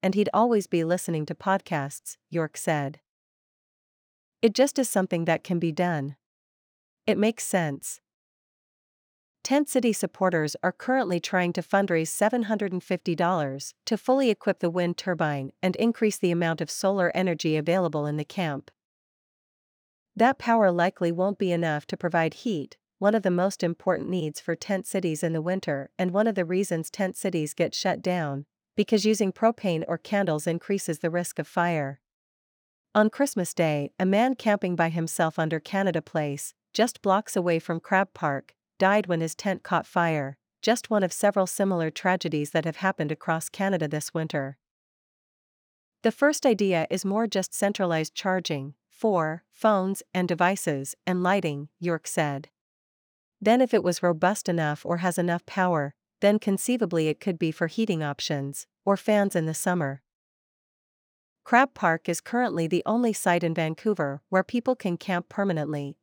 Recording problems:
none

